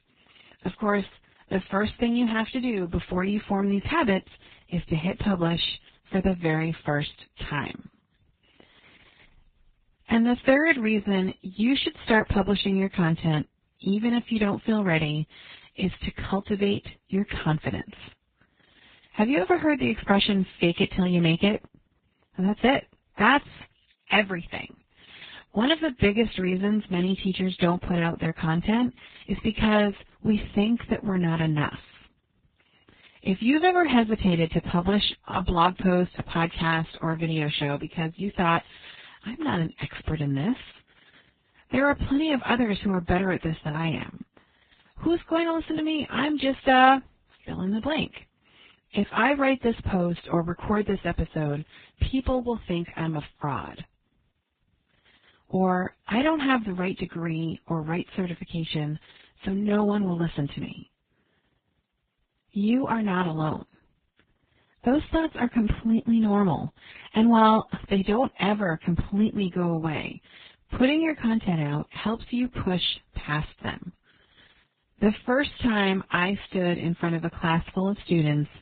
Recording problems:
garbled, watery; badly; nothing above 4 kHz
high frequencies cut off; slight

